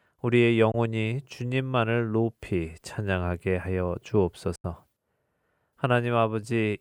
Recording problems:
choppy; occasionally; at 4.5 s; 2% of the speech affected

